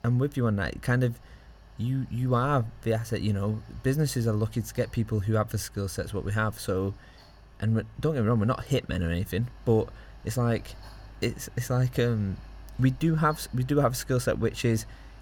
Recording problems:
machinery noise; faint; throughout; 20 dB below the speech

